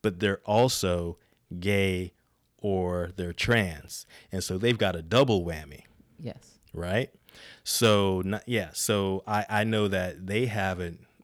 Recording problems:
none

